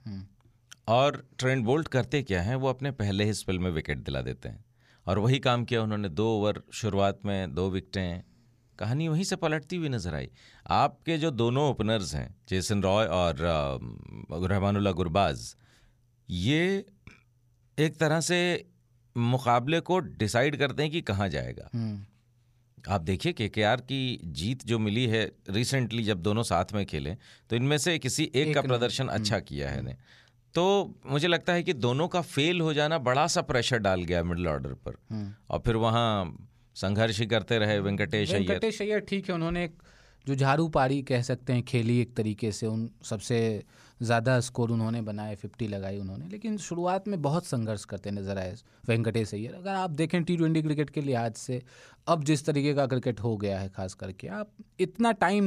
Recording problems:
abrupt cut into speech; at the end

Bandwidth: 15 kHz